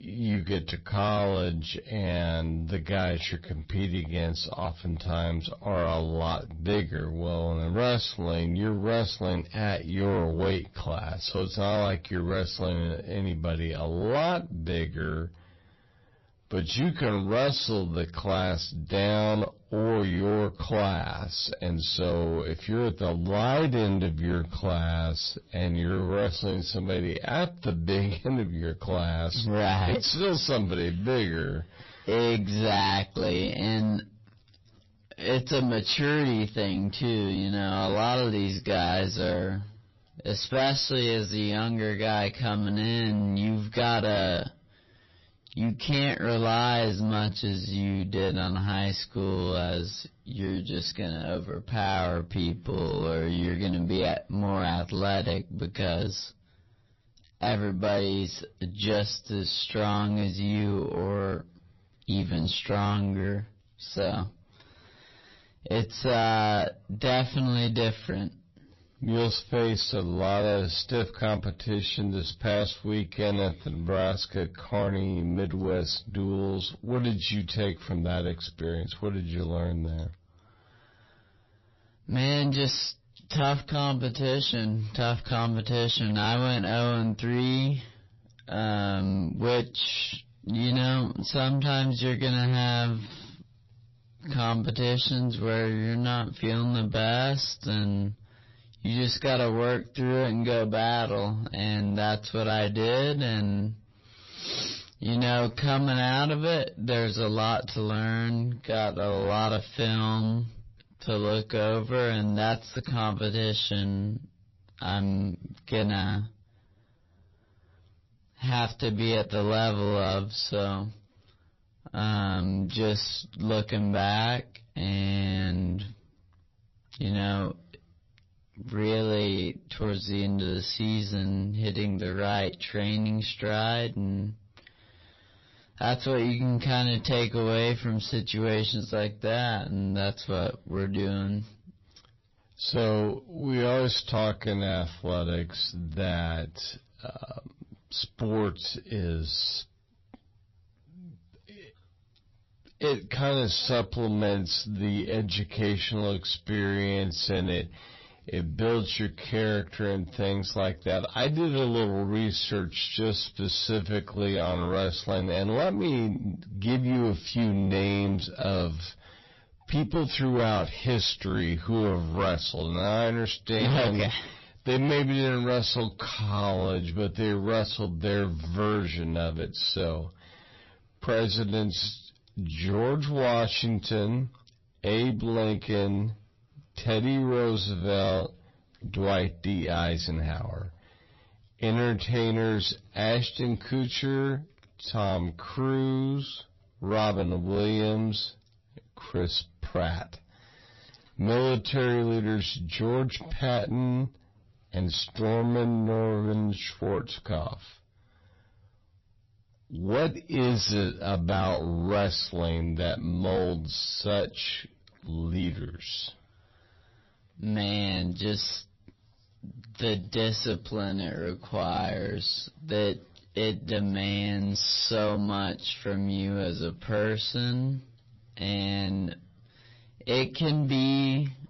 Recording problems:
distortion; heavy; 7 dB below the speech
wrong speed, natural pitch; too slow; 0.6 times normal speed
garbled, watery; slightly; nothing above 5.5 kHz

